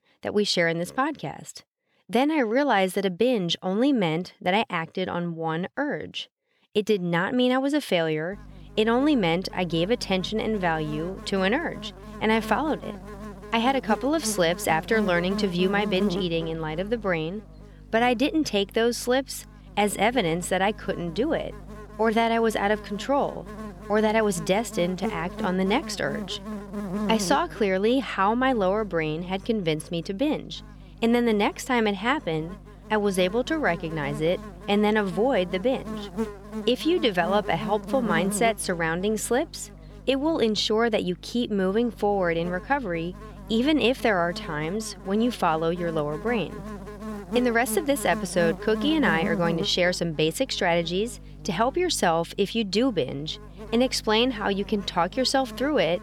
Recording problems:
electrical hum; noticeable; from 8.5 s on; 50 Hz, 15 dB below the speech

